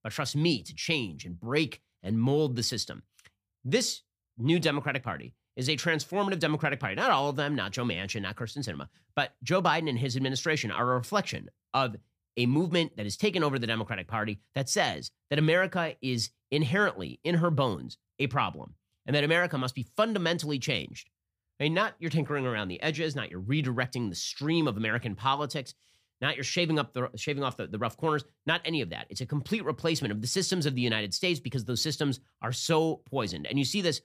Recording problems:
none

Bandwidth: 15 kHz